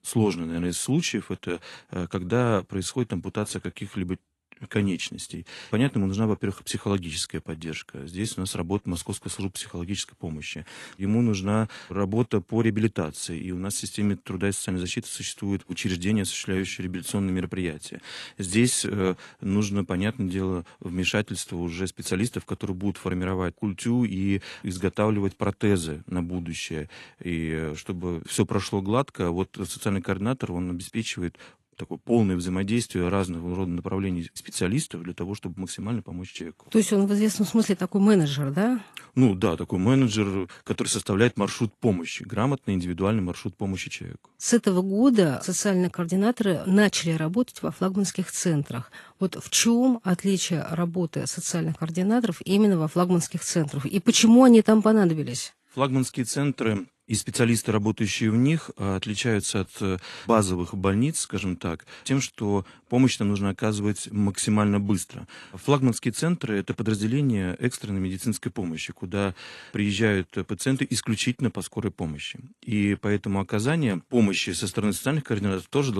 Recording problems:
garbled, watery; slightly; nothing above 11.5 kHz
abrupt cut into speech; at the end

